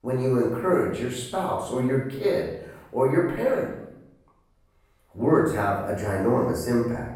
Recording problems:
off-mic speech; far
room echo; noticeable; dies away in 0.7 s

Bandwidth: 18.5 kHz